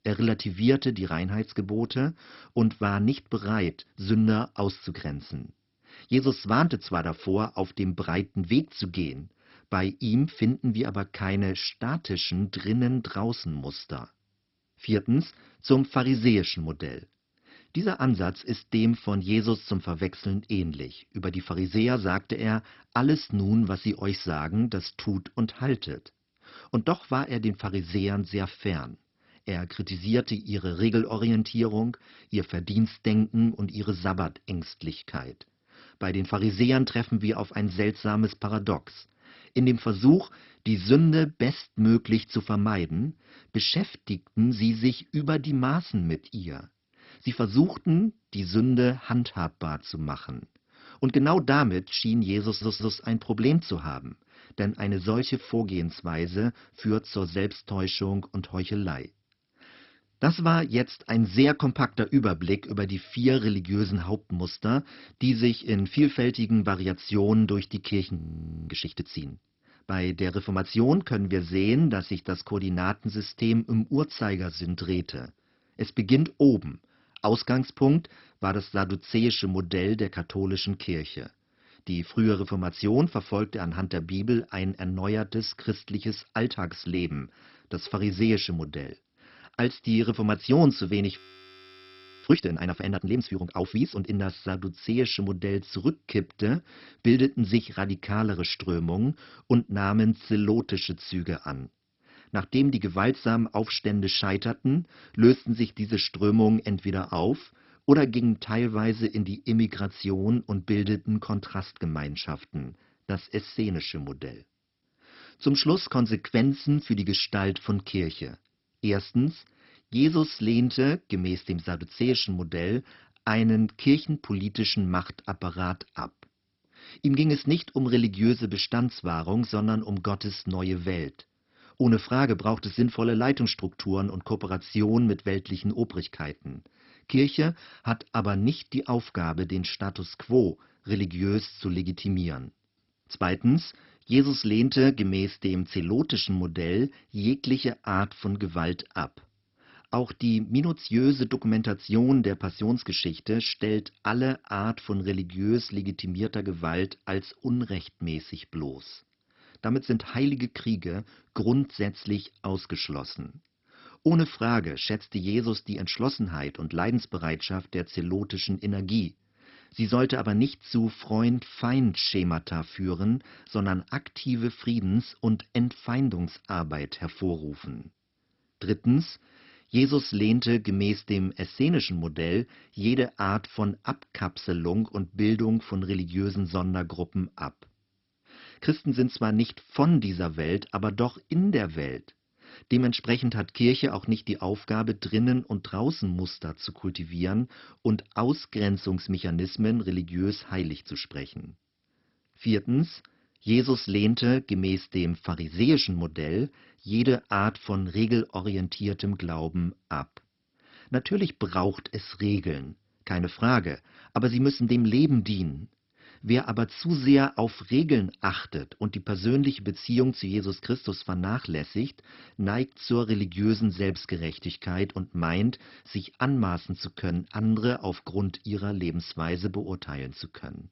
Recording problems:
garbled, watery; badly; nothing above 5.5 kHz
audio stuttering; at 52 s
audio freezing; at 1:08 for 0.5 s and at 1:31 for 1 s

